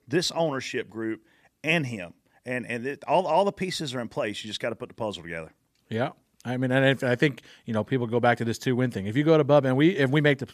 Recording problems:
none

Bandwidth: 14.5 kHz